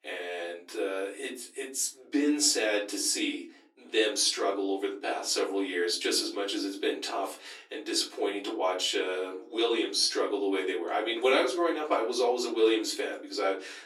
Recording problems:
off-mic speech; far
thin; somewhat; fading below 300 Hz
room echo; very slight; dies away in 0.3 s

